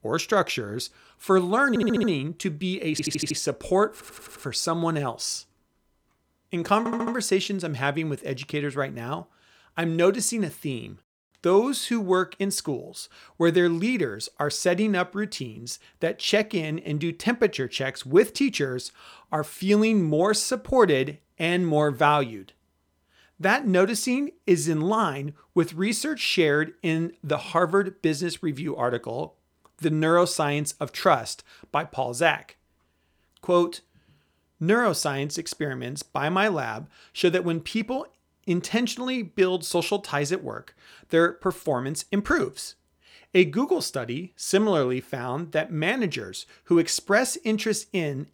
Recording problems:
audio stuttering; 4 times, first at 1.5 s

